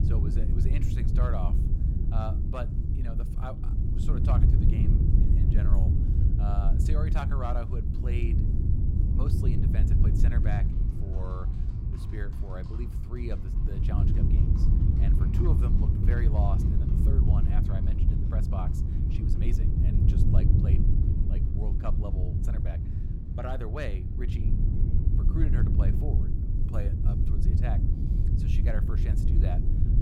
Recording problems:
wind noise on the microphone; heavy; as loud as the speech
animal sounds; faint; throughout; 25 dB below the speech

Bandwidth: 16.5 kHz